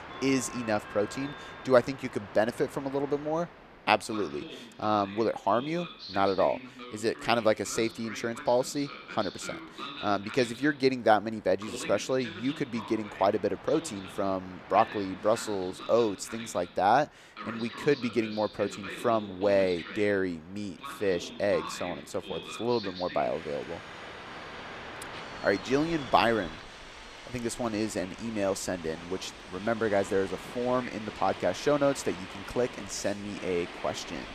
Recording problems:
train or aircraft noise; noticeable; throughout; 10 dB below the speech

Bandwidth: 14.5 kHz